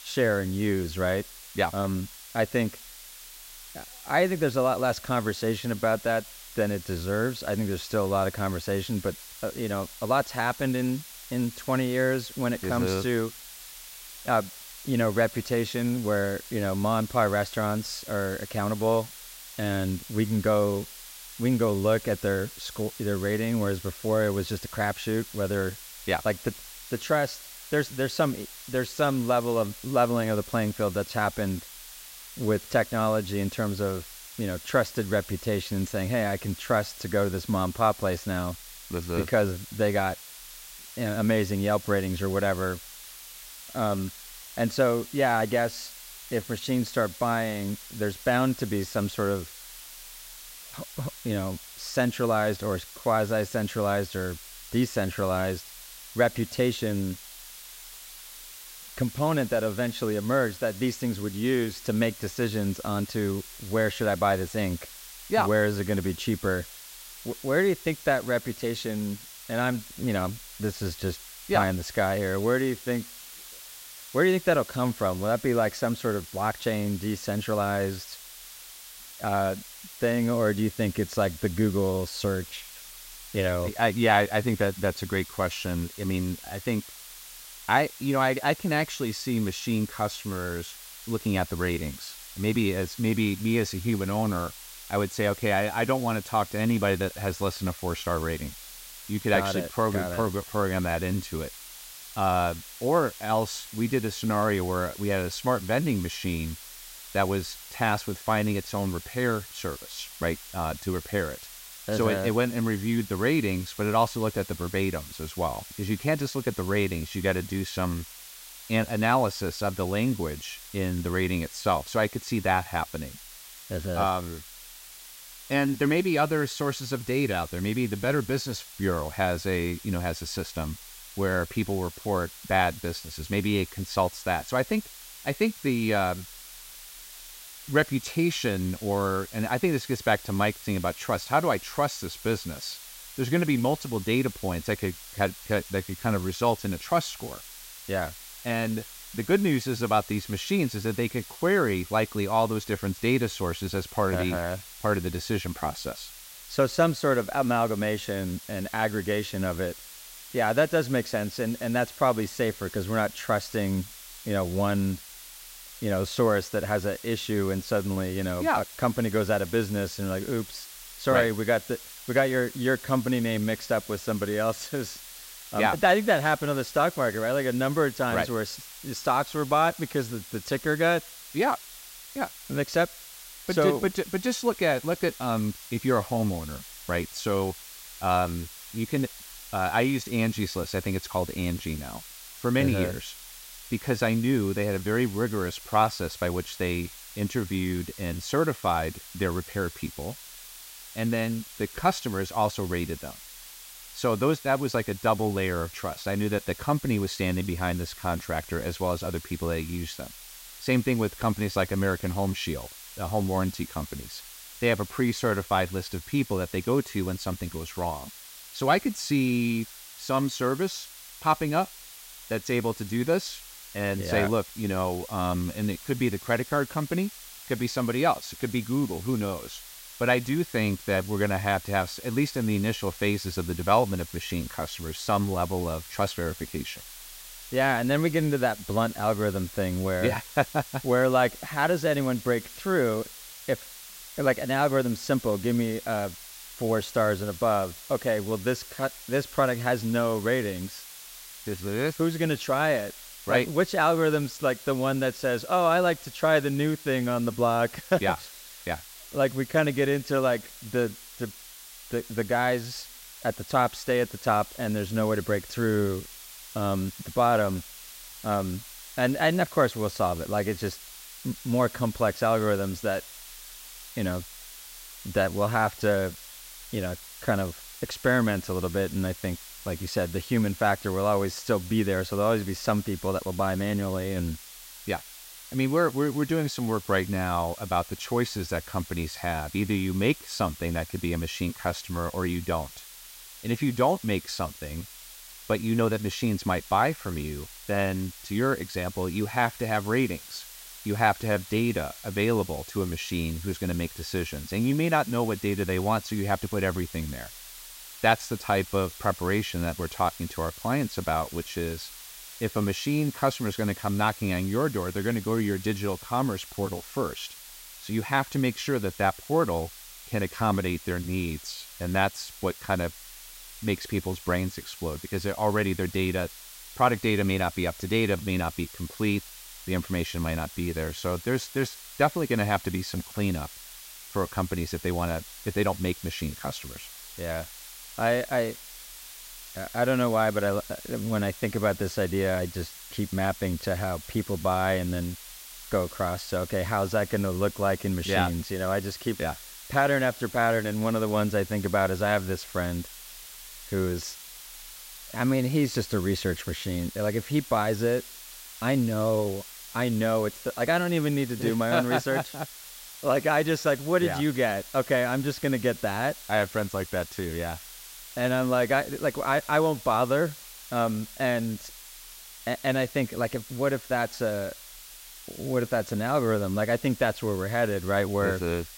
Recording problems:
hiss; noticeable; throughout; 15 dB below the speech

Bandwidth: 16 kHz